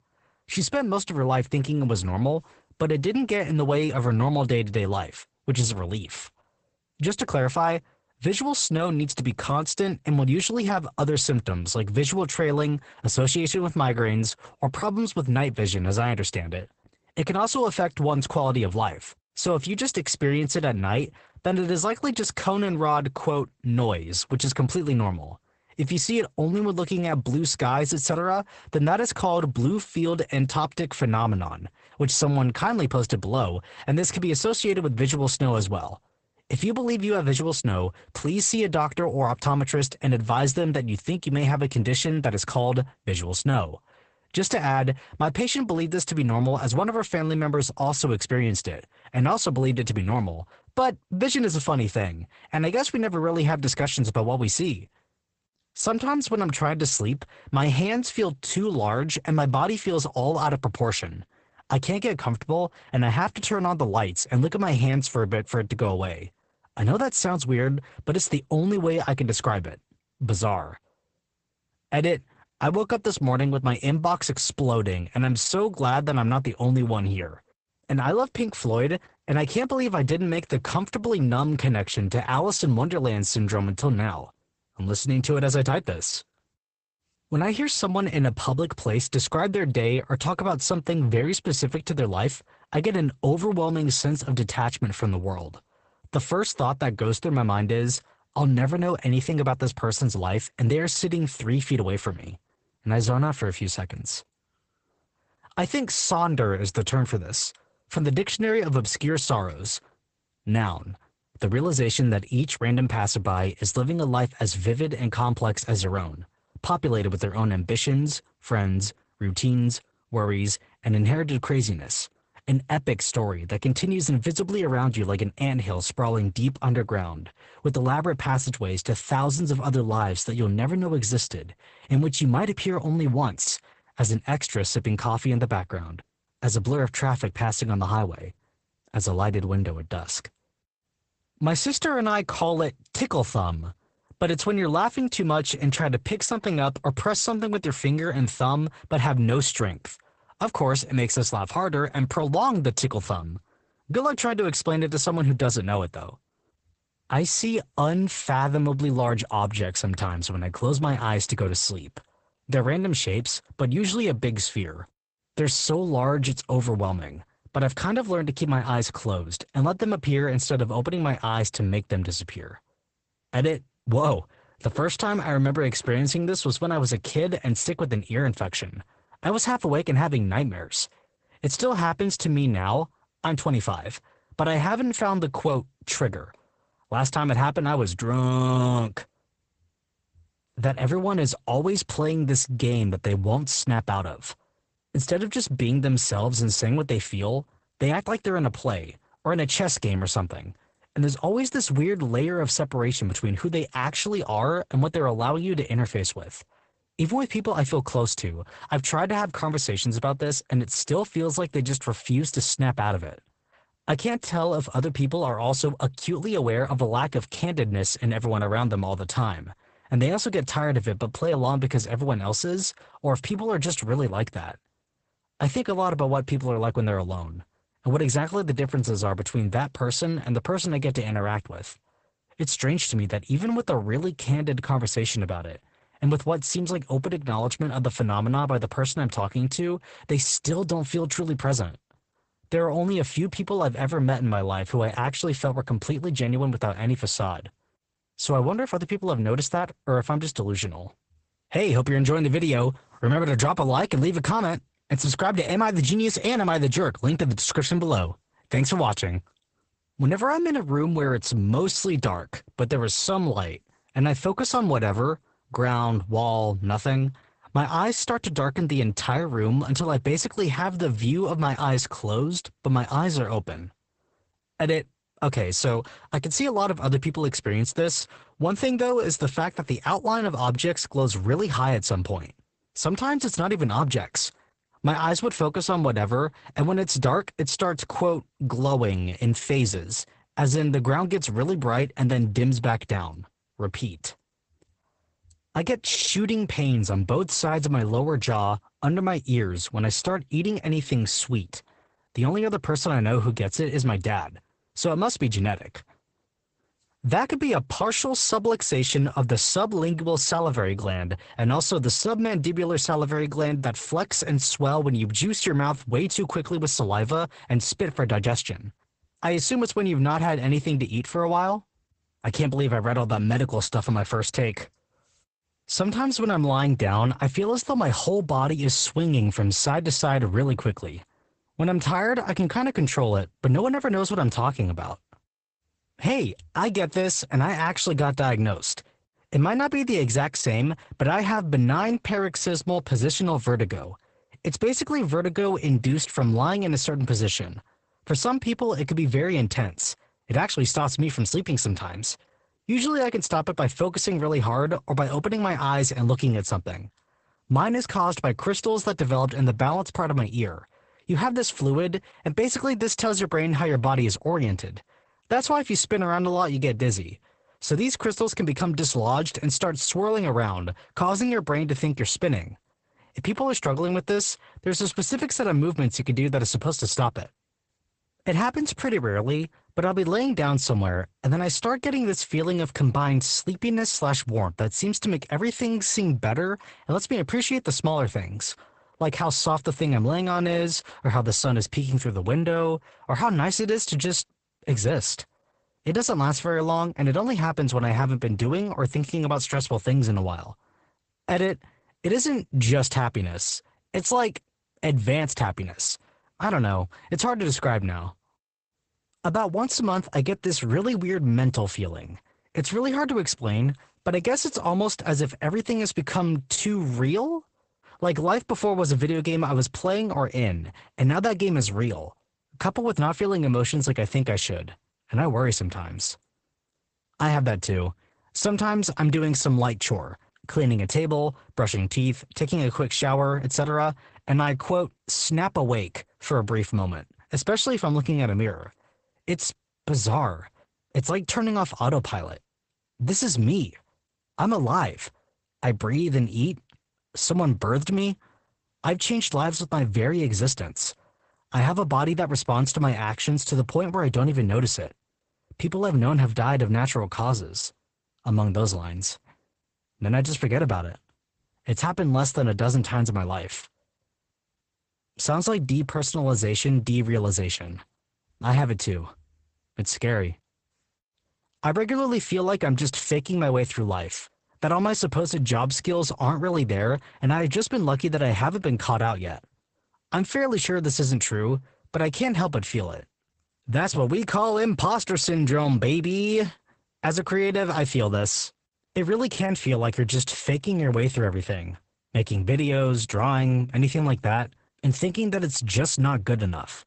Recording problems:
garbled, watery; badly; nothing above 8 kHz

